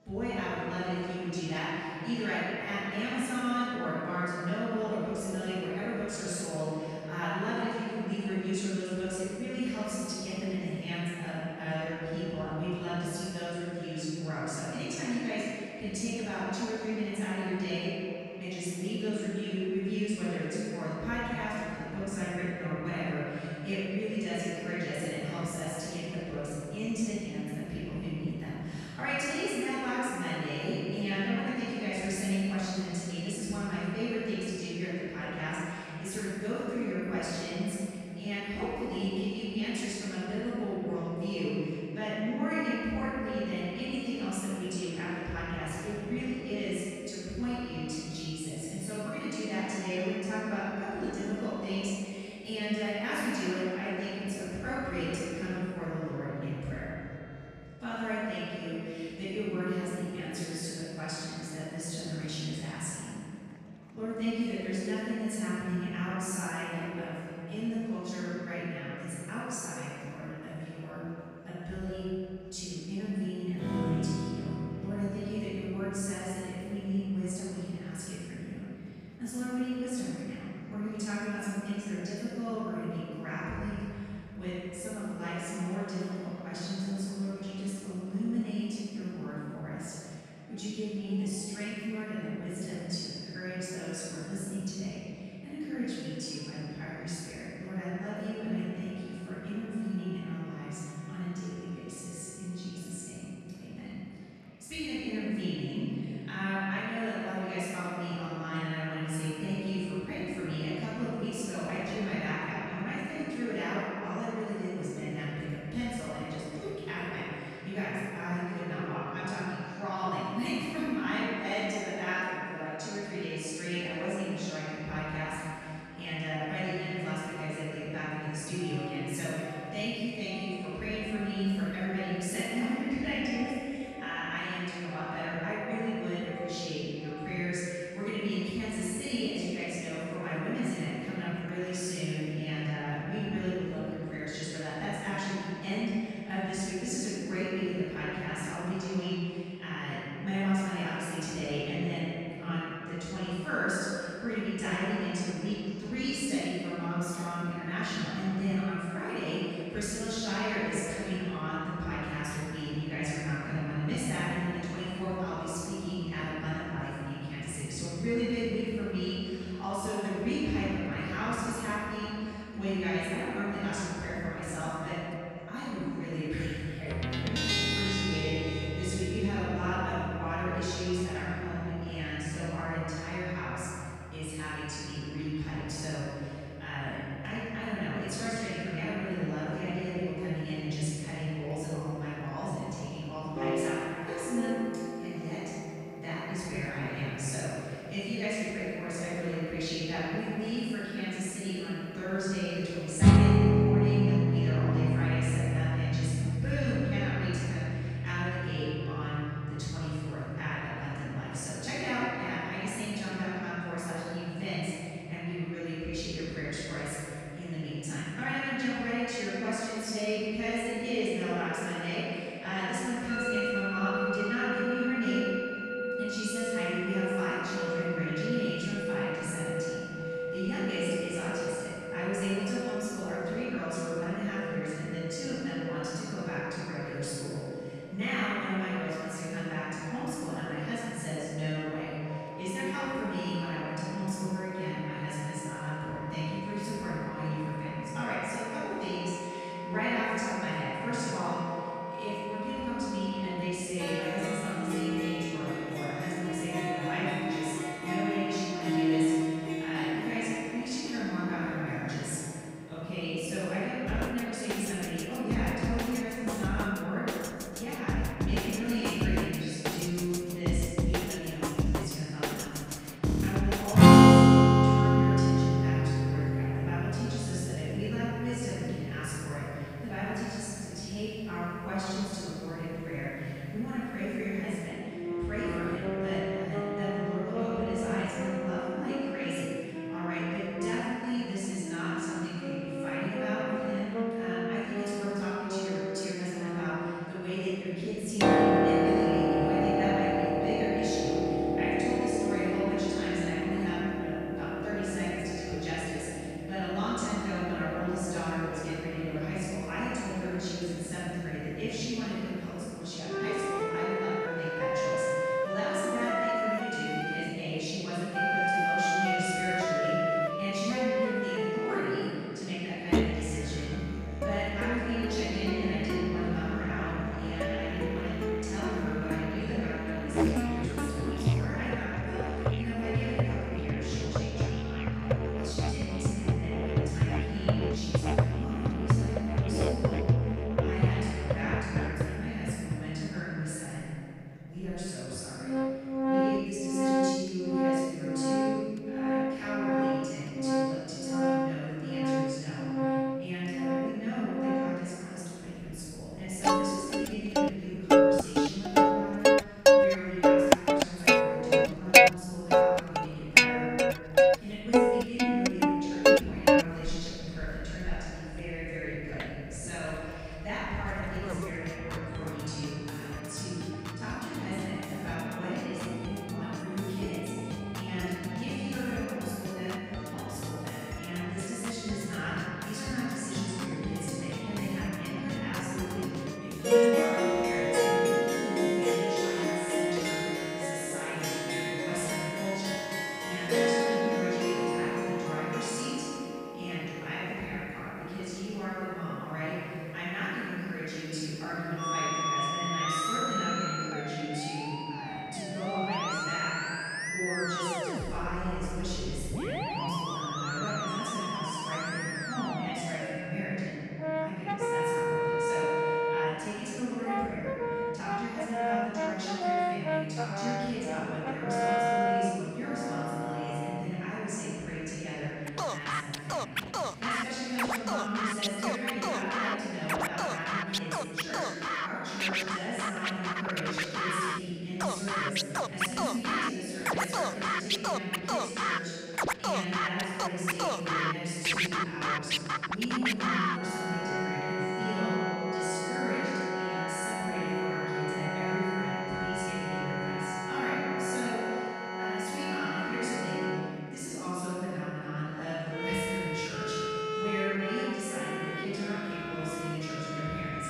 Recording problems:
room echo; strong; dies away in 2.7 s
off-mic speech; far
background music; very loud; throughout; 4 dB above the speech
murmuring crowd; faint; throughout; 25 dB below the speech

